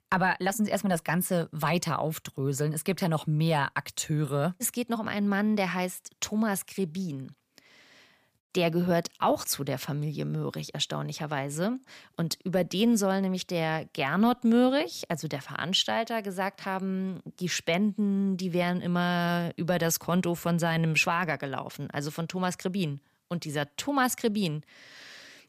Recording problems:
none

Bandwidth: 15 kHz